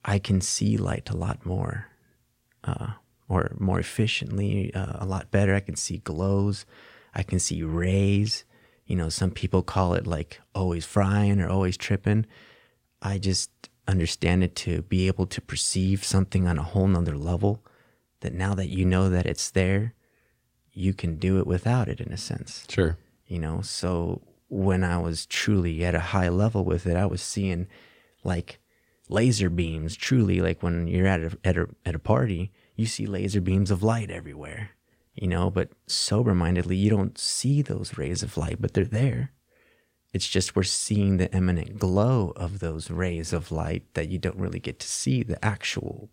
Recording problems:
none

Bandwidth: 16 kHz